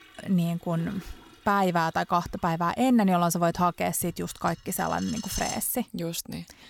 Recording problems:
household noises; noticeable; throughout; 15 dB below the speech

